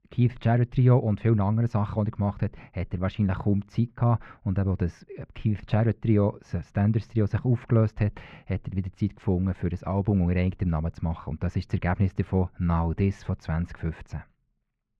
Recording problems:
muffled; very; fading above 2 kHz

